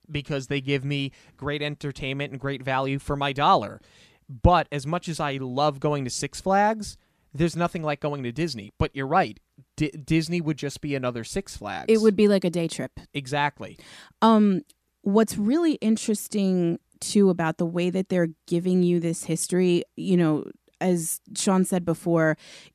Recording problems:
none

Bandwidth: 14.5 kHz